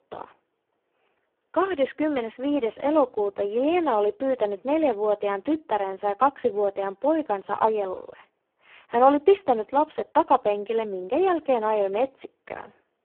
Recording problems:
phone-call audio; poor line

